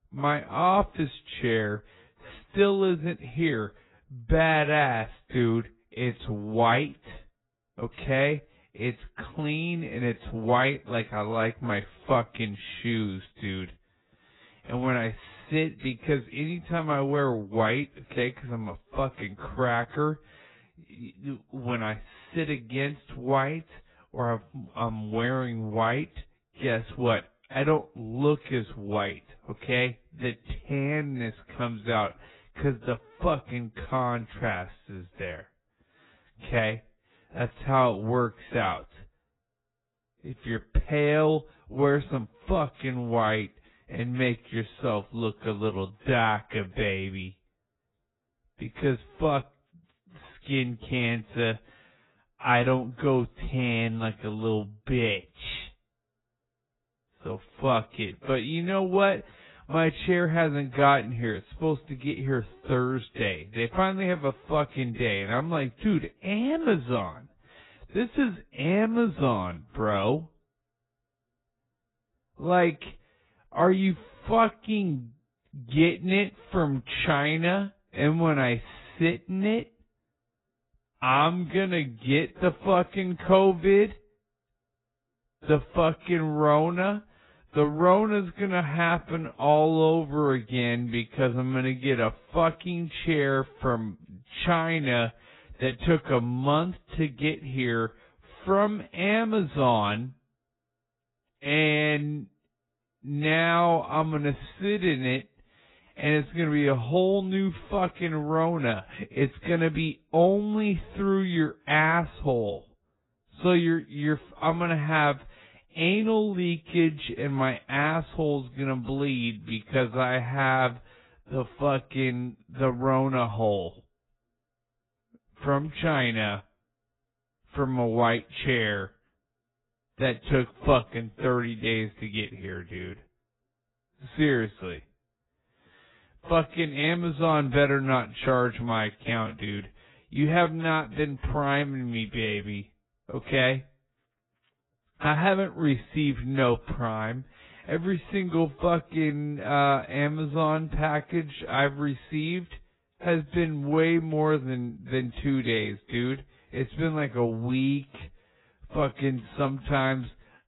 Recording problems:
garbled, watery; badly; nothing above 4 kHz
wrong speed, natural pitch; too slow; 0.6 times normal speed

